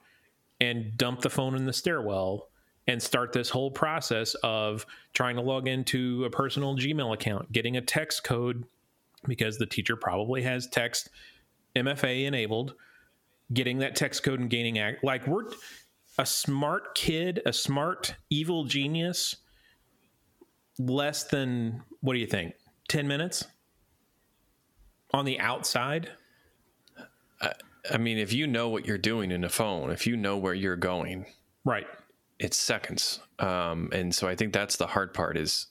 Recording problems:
squashed, flat; heavily

